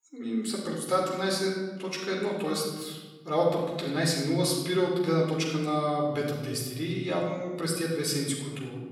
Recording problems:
off-mic speech; far
room echo; noticeable; dies away in 1.2 s

